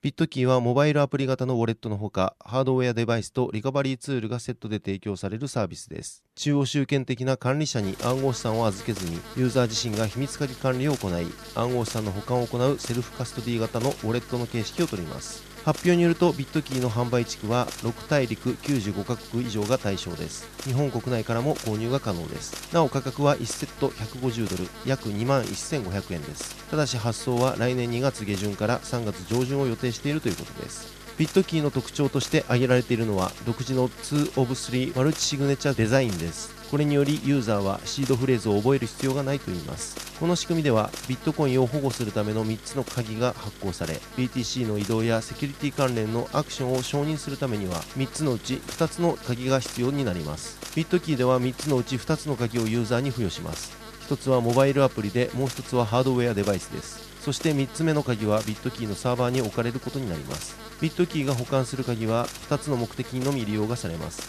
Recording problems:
electrical hum; noticeable; from 8 s on; 50 Hz, 10 dB below the speech

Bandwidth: 14 kHz